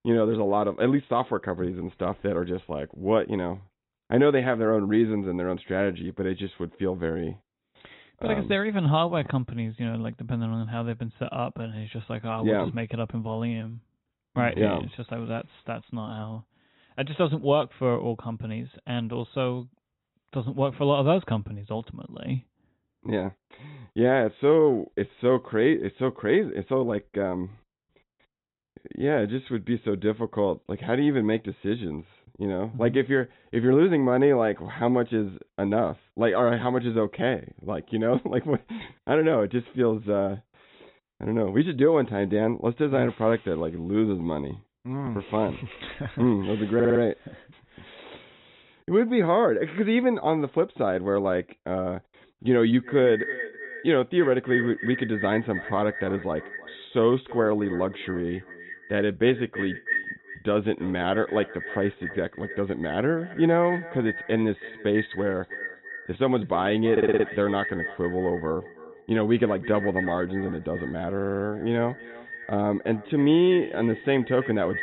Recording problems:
echo of what is said; strong; from 53 s on; 330 ms later, 10 dB below the speech
high frequencies cut off; severe; nothing above 4 kHz
audio stuttering; at 47 s, at 1:07 and at 1:11

